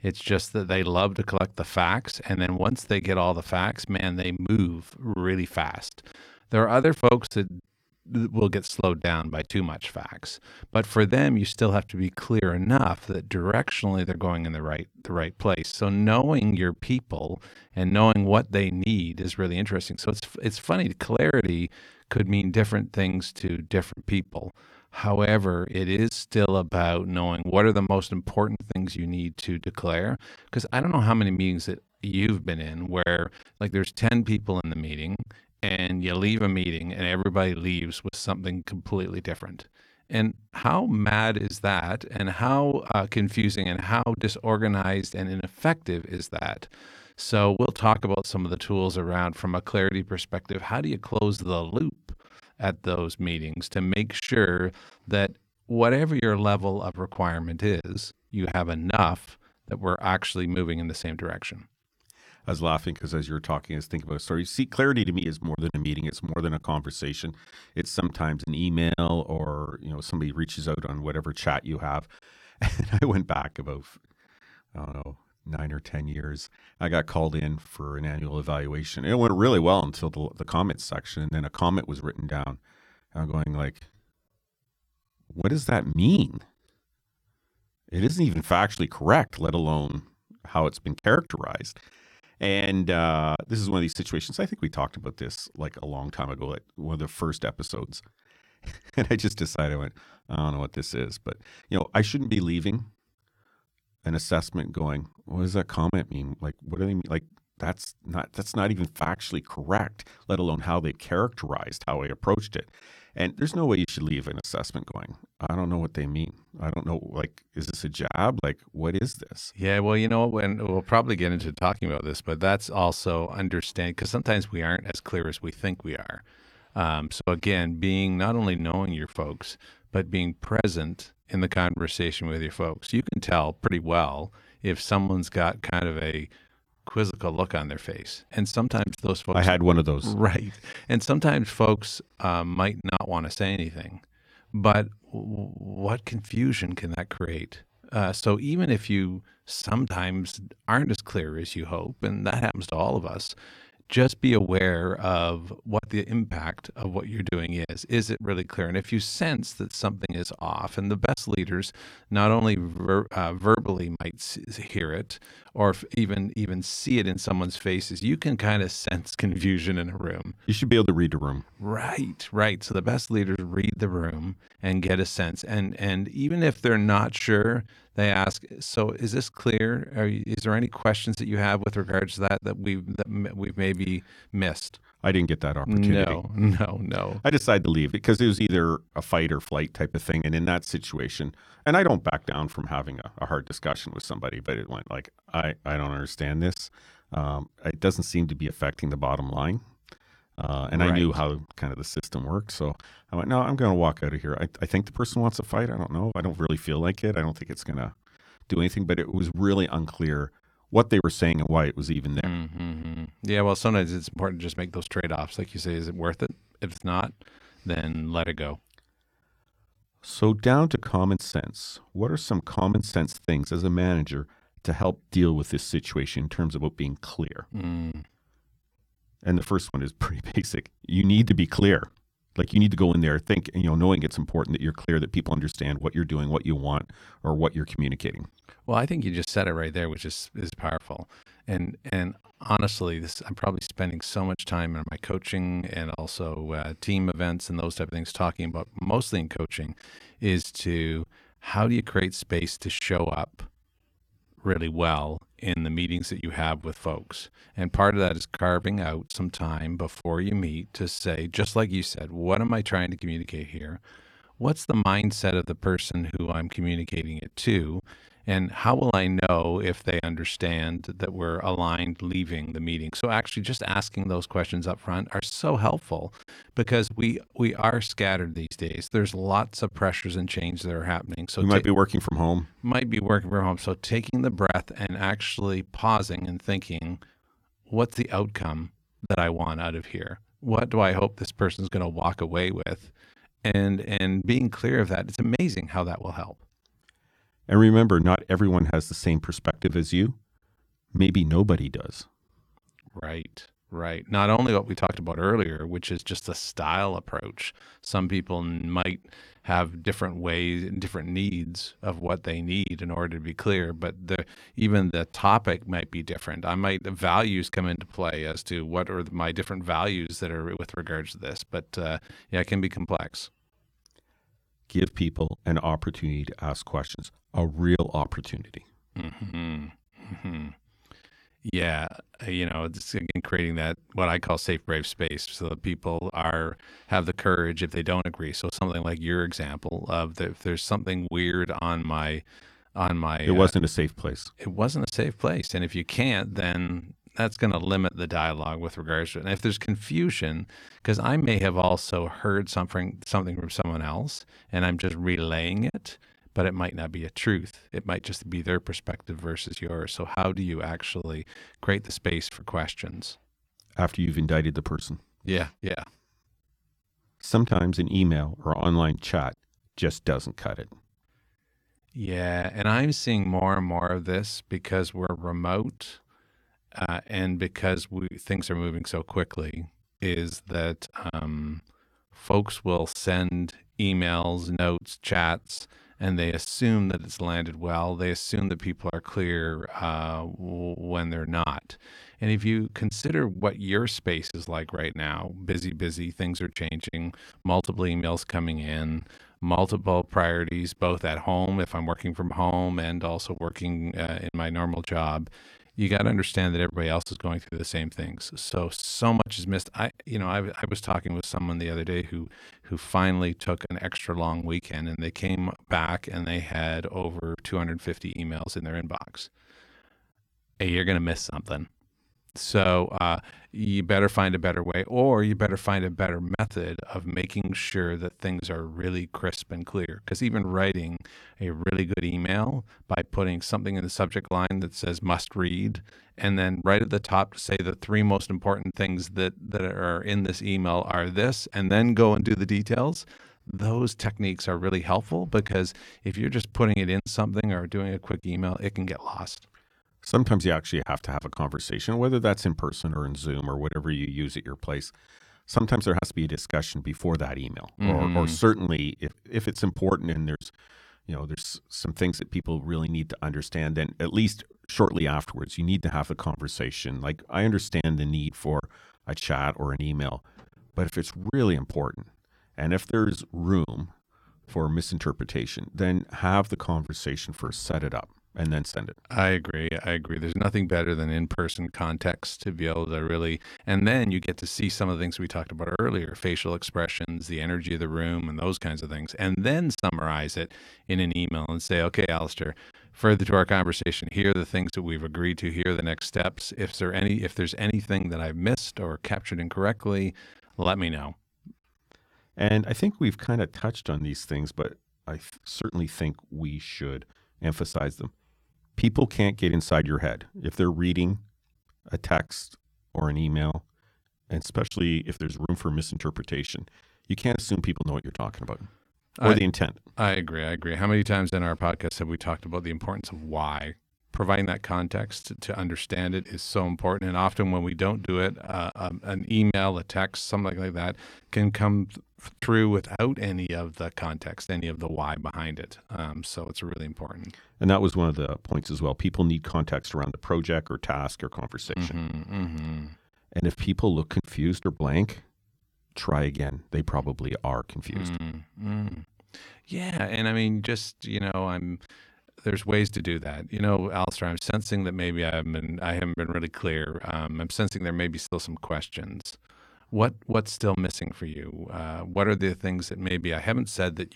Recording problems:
choppy; occasionally; 5% of the speech affected

